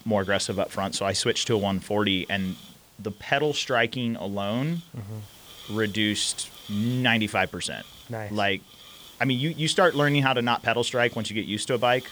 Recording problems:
hiss; faint; throughout; 20 dB below the speech

